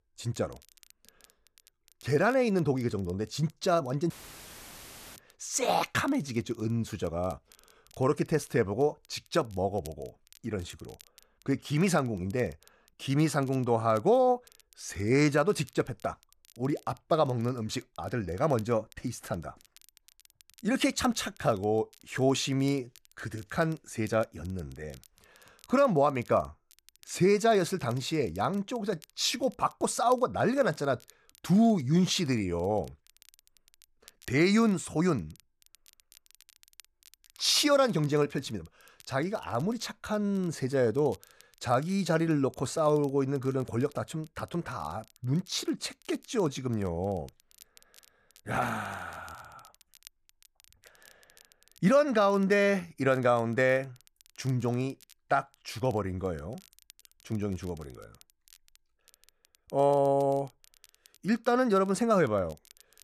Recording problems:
crackle, like an old record; faint; 30 dB below the speech
audio cutting out; filled with static; at 4 s for 1 s

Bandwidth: 14 kHz